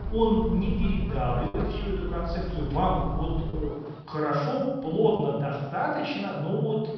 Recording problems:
room echo; strong; dies away in 1.3 s
off-mic speech; far
high frequencies cut off; noticeable; nothing above 5.5 kHz
electrical hum; noticeable; until 4 s; 60 Hz, 15 dB below the speech
low rumble; faint; until 3.5 s; 20 dB below the speech
choppy; occasionally; at 1.5 s and at 3.5 s; 3% of the speech affected

